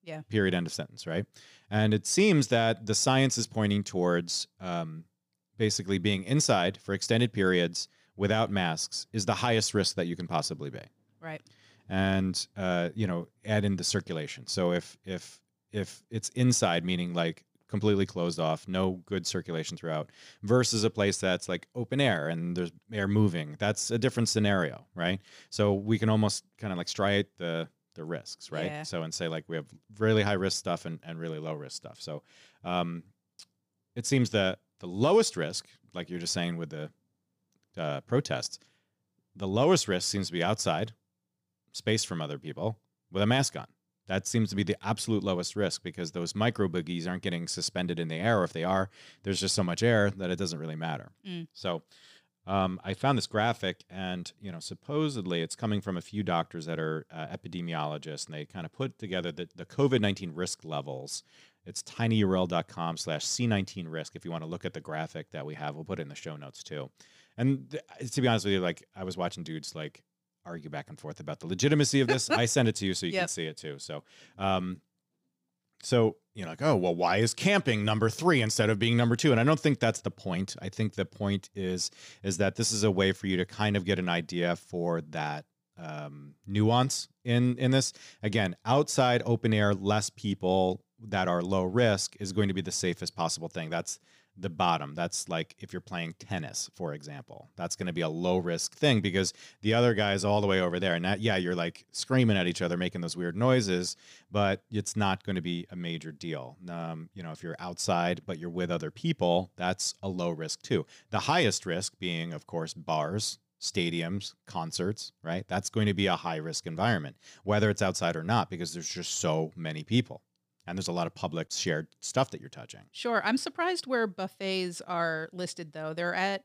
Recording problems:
none

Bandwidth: 15 kHz